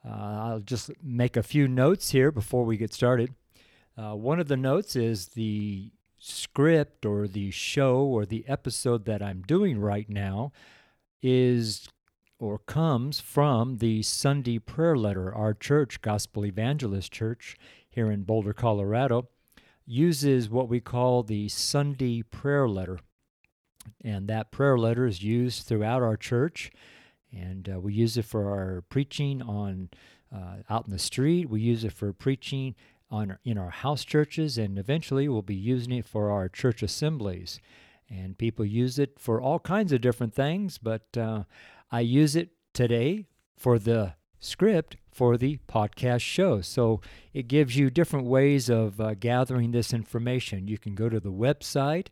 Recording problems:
none

